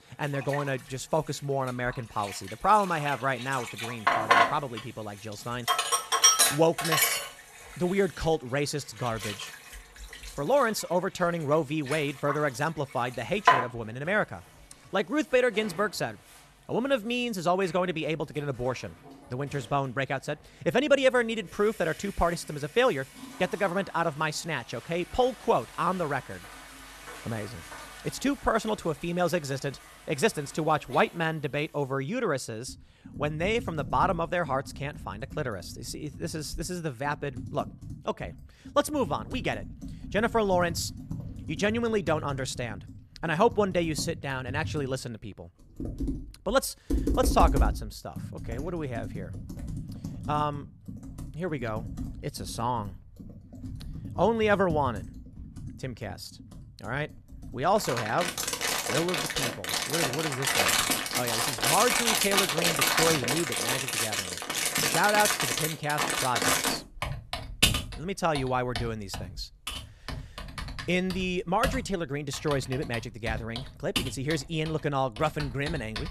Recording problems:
household noises; very loud; throughout; as loud as the speech

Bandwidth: 13.5 kHz